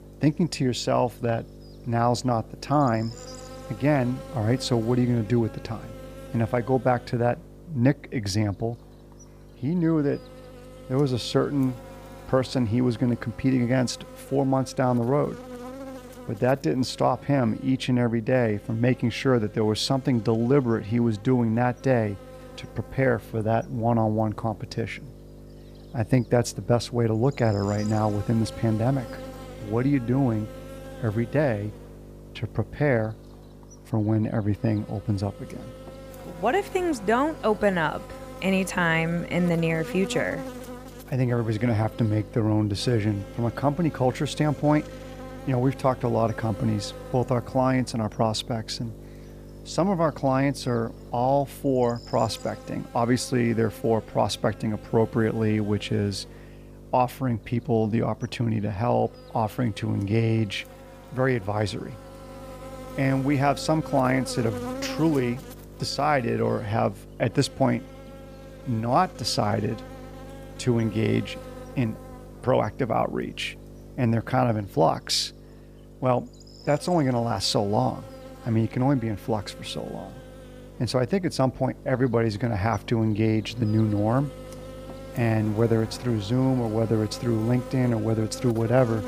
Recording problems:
electrical hum; noticeable; throughout; 50 Hz, 15 dB below the speech

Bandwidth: 15 kHz